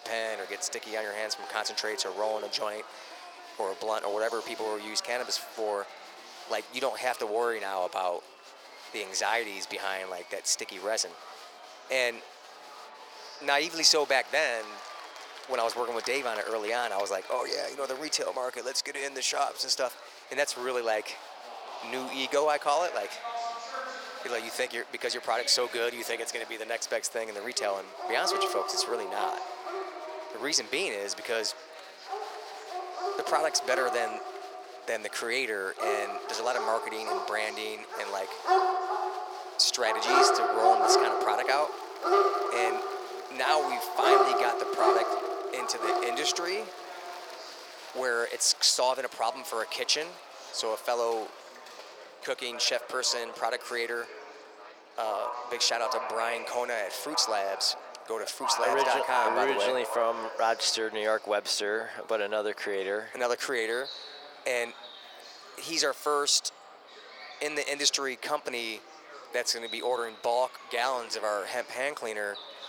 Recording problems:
thin; very; fading below 500 Hz
animal sounds; loud; throughout; 1 dB below the speech
murmuring crowd; noticeable; throughout; 15 dB below the speech

